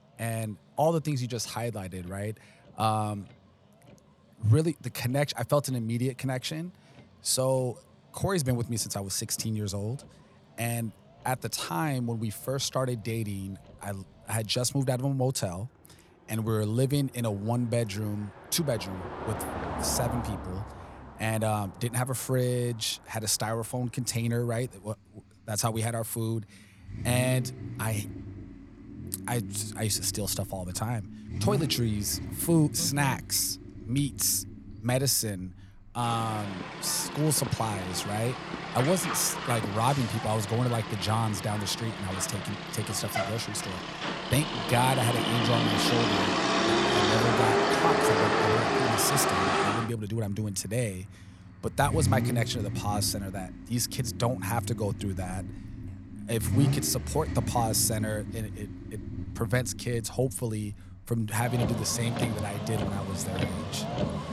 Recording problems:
traffic noise; loud; throughout; 2 dB below the speech

